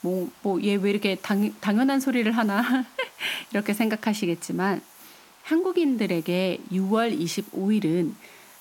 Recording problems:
hiss; faint; throughout; 25 dB below the speech

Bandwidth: 17 kHz